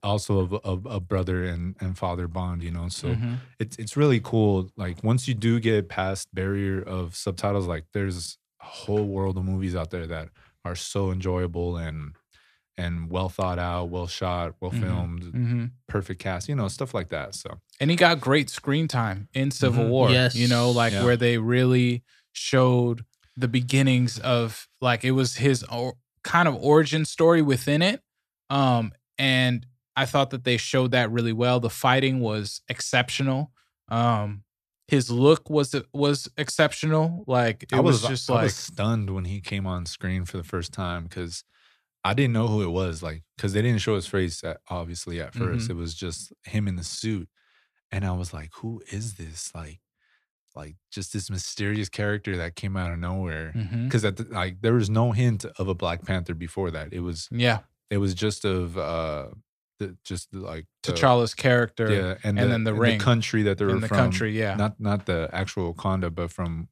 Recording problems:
none

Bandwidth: 14 kHz